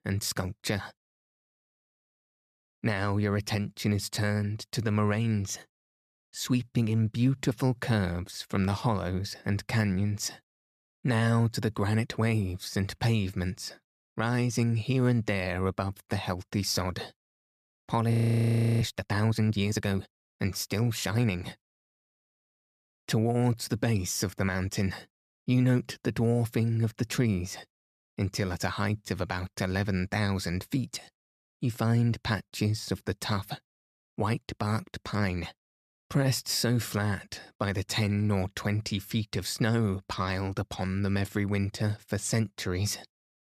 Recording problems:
audio freezing; at 18 s for 0.5 s

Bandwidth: 14.5 kHz